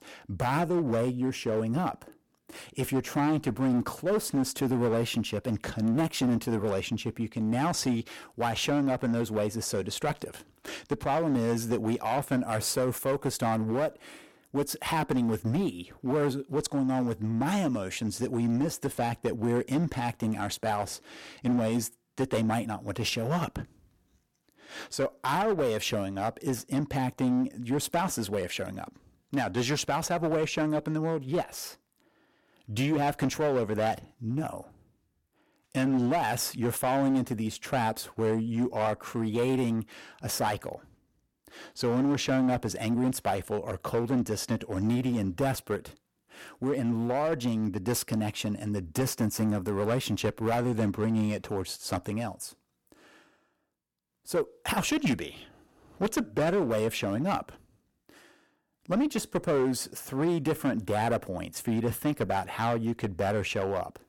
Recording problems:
distortion; slight; 8% of the sound clipped

